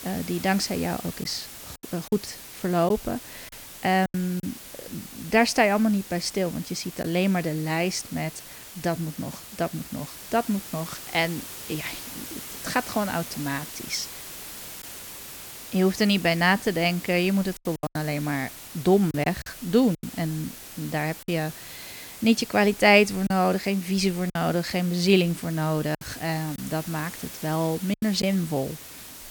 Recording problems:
hiss; noticeable; throughout; 15 dB below the speech
choppy; occasionally; 4% of the speech affected

